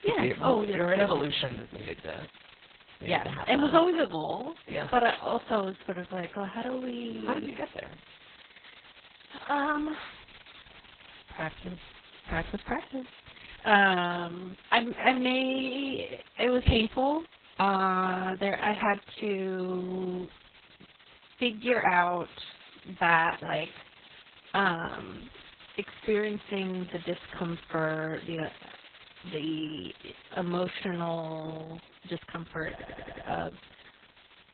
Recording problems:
garbled, watery; badly; nothing above 4 kHz
hiss; faint; throughout; 25 dB below the speech
audio stuttering; at 33 s

